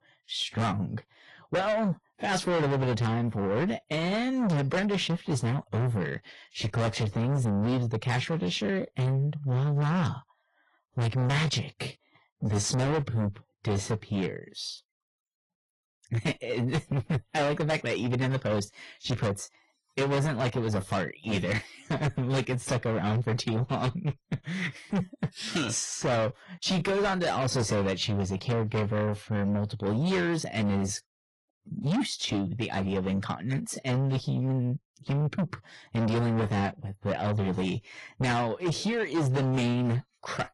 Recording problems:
distortion; heavy; 6 dB below the speech
garbled, watery; slightly; nothing above 10.5 kHz

